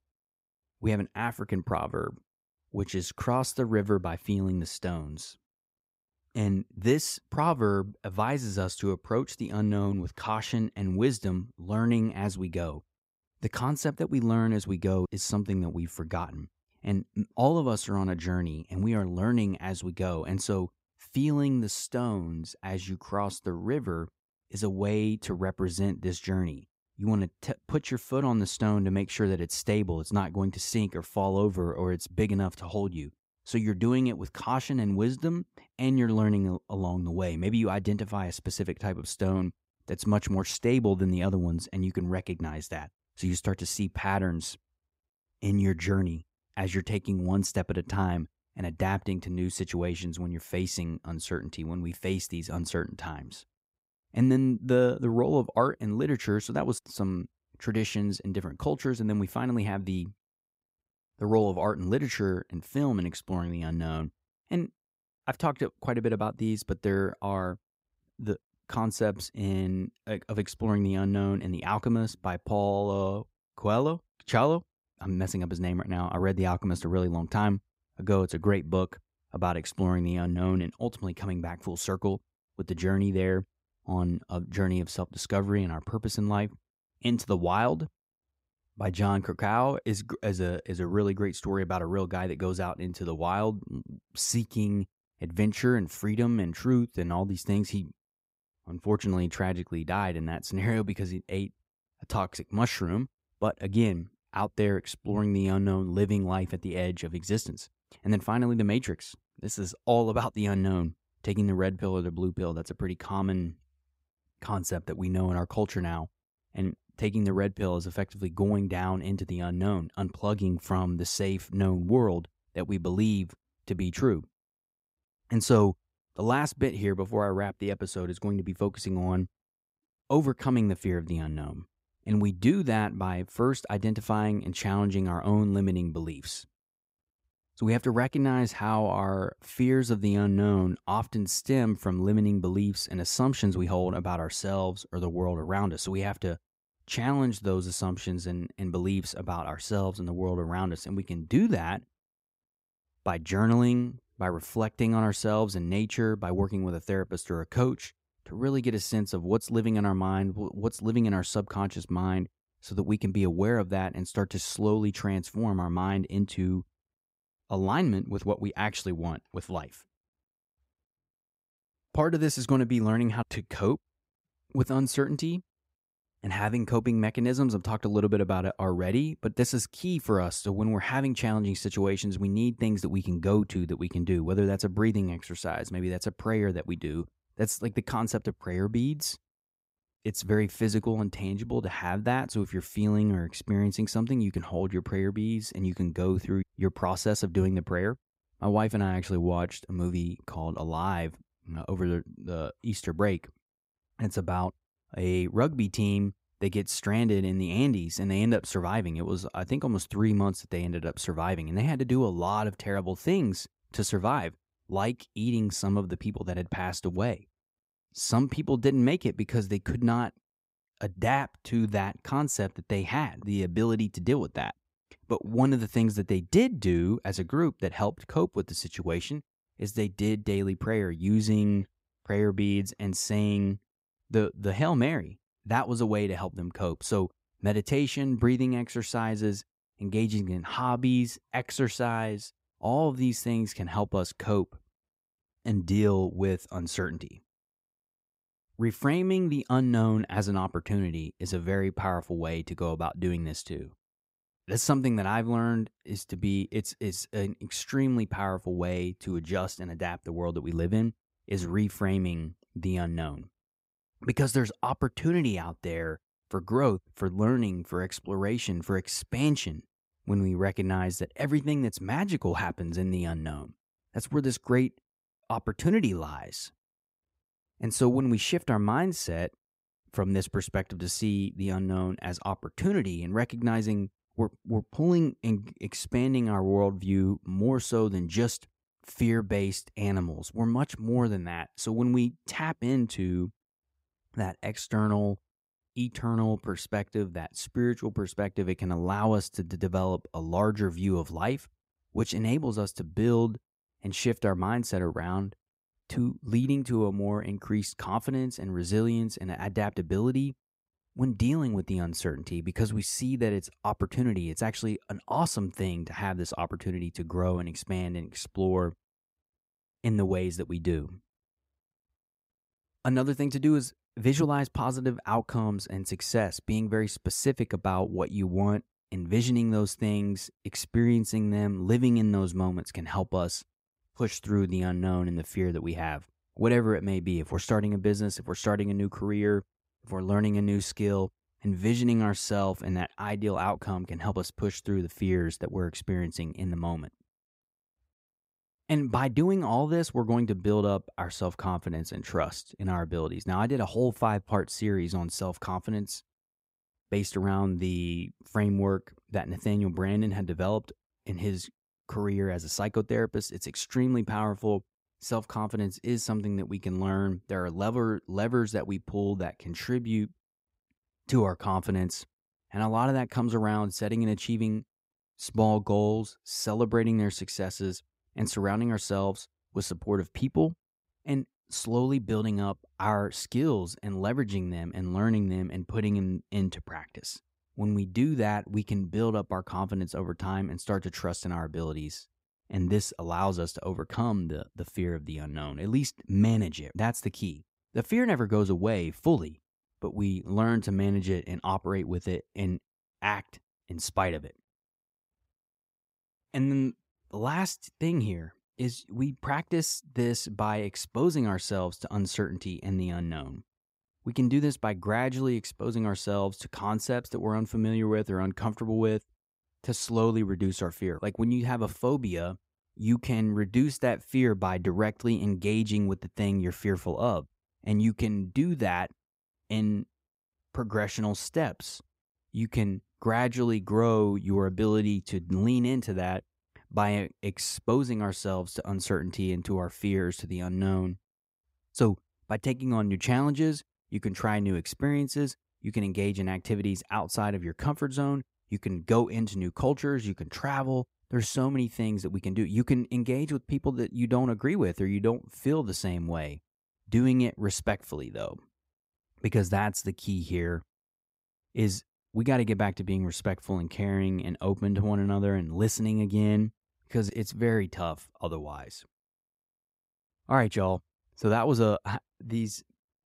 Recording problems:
none

